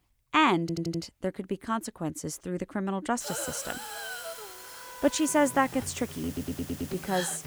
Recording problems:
background music; noticeable; from 4.5 s on; 15 dB below the speech
hiss; noticeable; from 3 s on; 10 dB below the speech
audio stuttering; at 0.5 s and at 6.5 s

